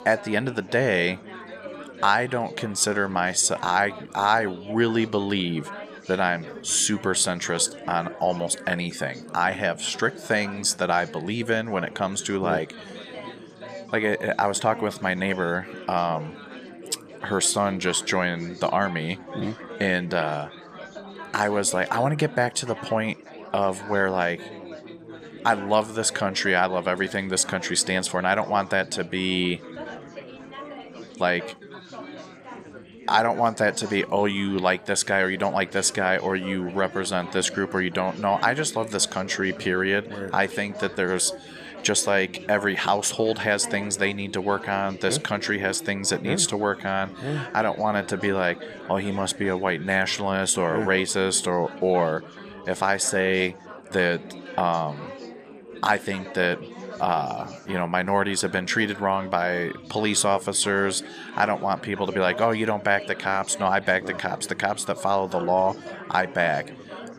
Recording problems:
chatter from many people; noticeable; throughout; 15 dB below the speech

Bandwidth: 14.5 kHz